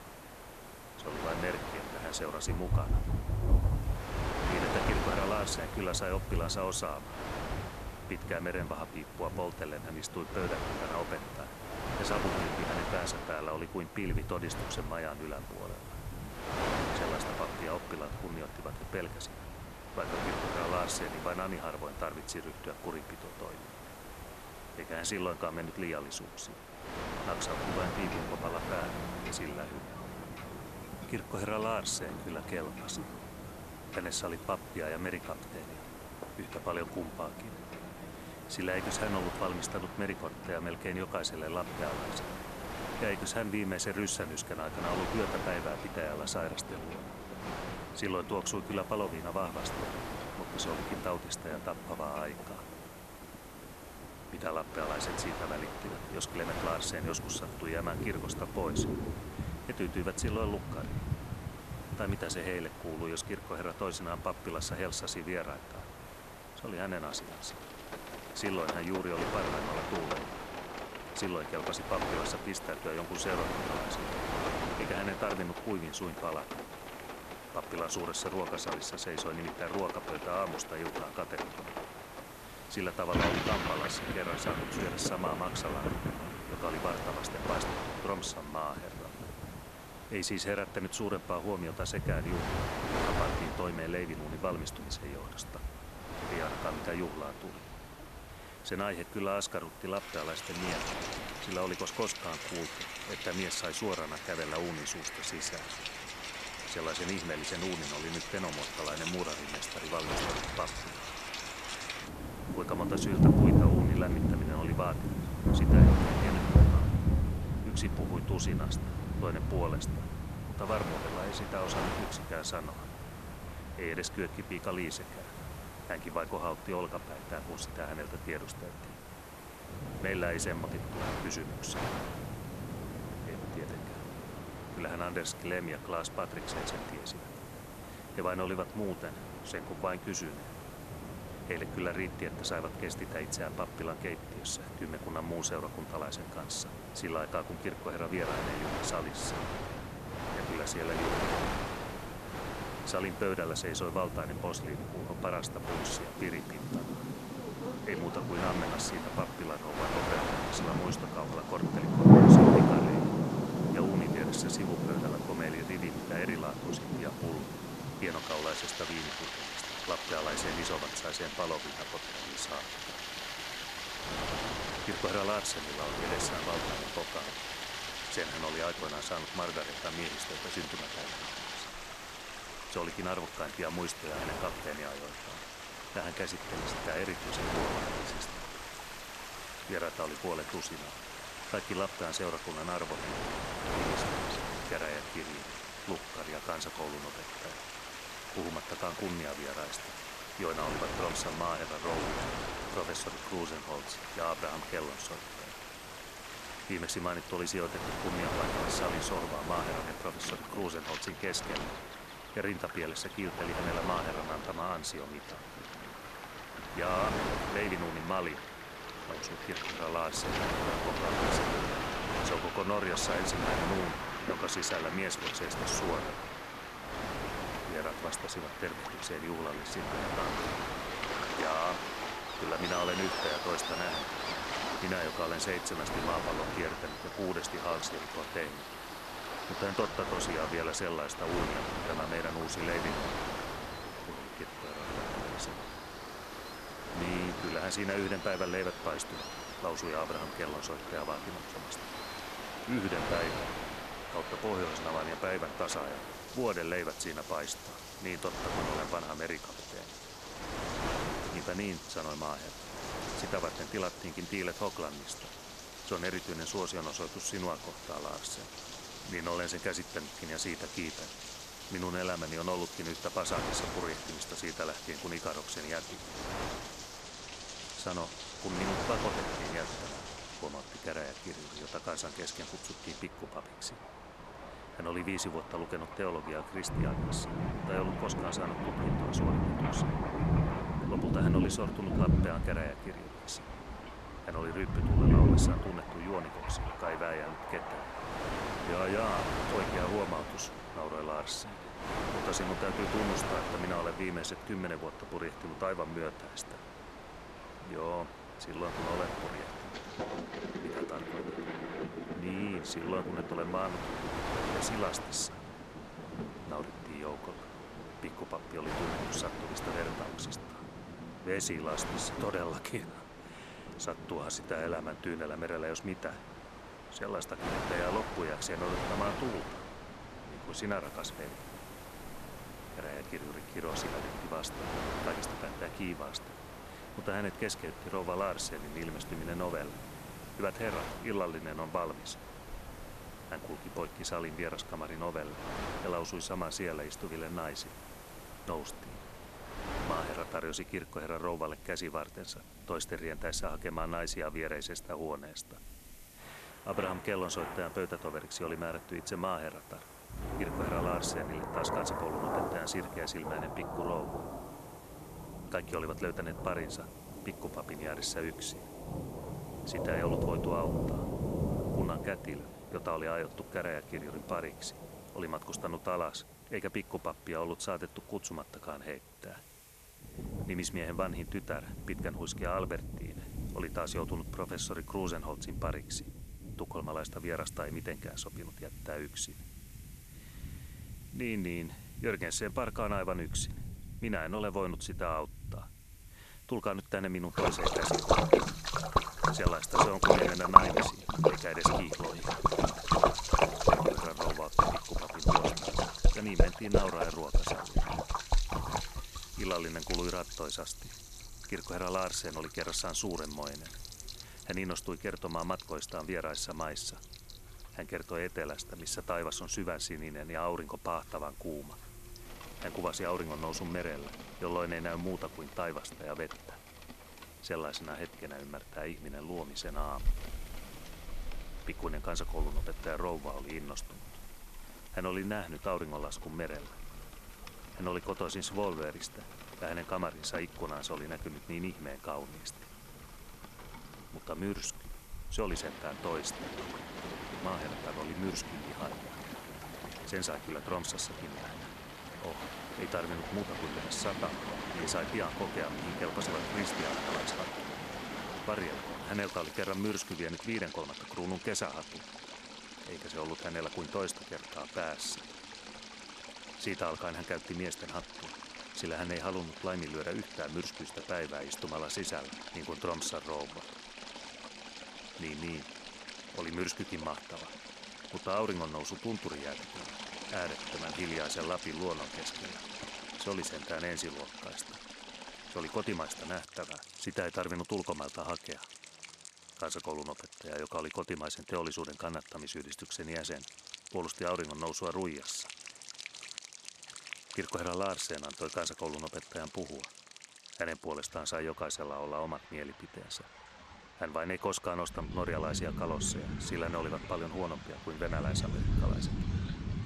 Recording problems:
rain or running water; very loud; throughout; 1 dB above the speech
wind noise on the microphone; heavy; until 5:50; 4 dB below the speech
hiss; noticeable; until 4:37 and from 5:31 to 7:40; 20 dB below the speech

